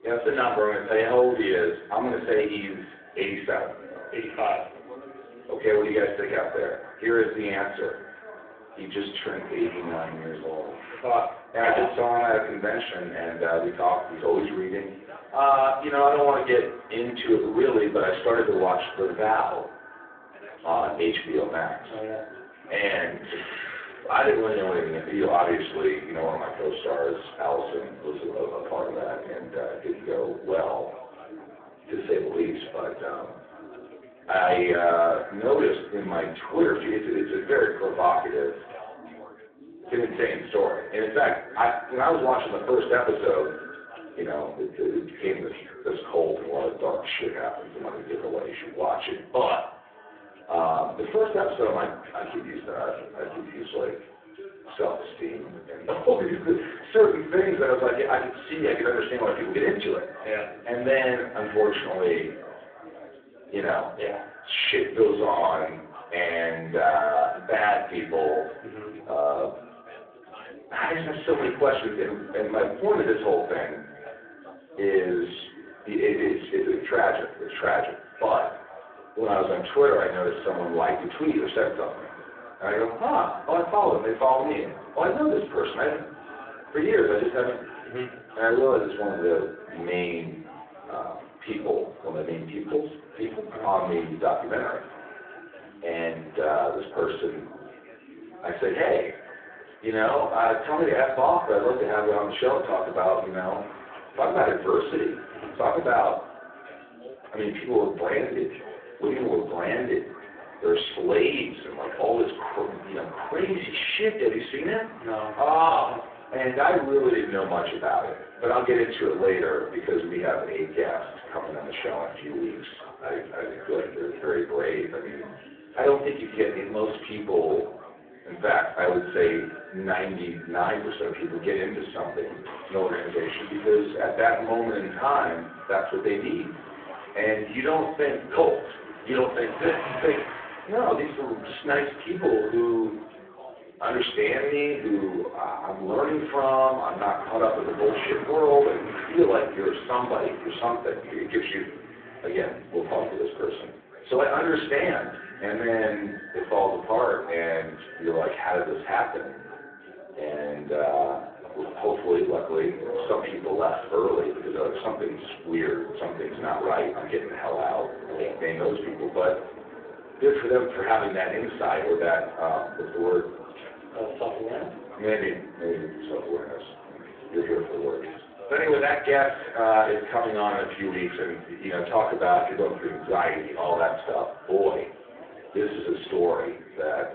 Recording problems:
phone-call audio; poor line
off-mic speech; far
echo of what is said; faint; throughout; 150 ms later, 20 dB below the speech
room echo; slight; dies away in 0.5 s
traffic noise; noticeable; throughout; 20 dB below the speech
background chatter; faint; throughout; 3 voices, 20 dB below the speech

